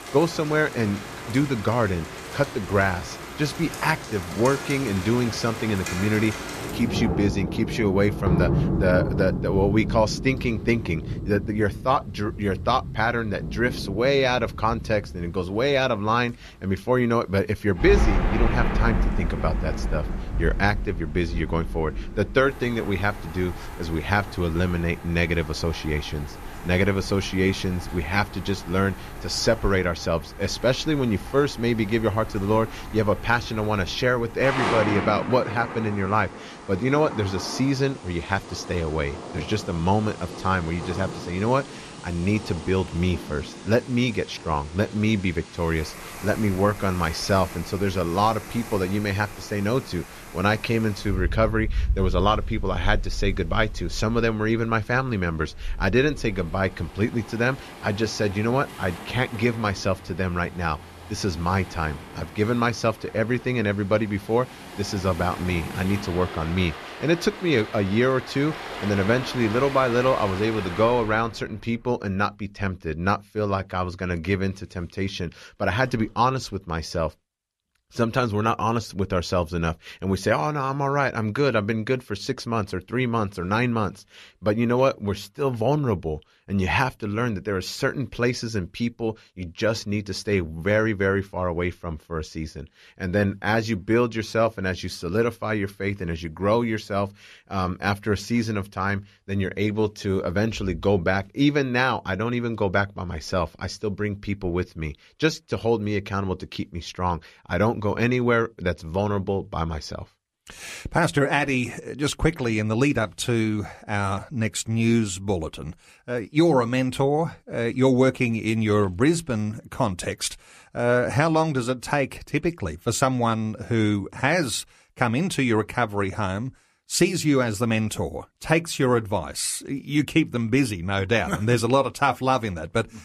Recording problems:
rain or running water; loud; until 1:11; 9 dB below the speech

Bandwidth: 14.5 kHz